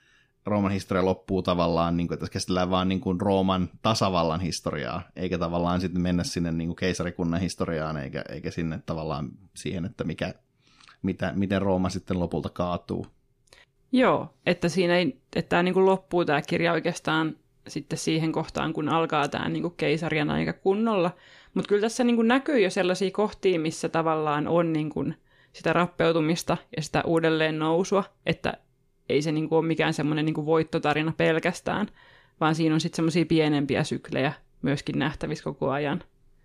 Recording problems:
none

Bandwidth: 15 kHz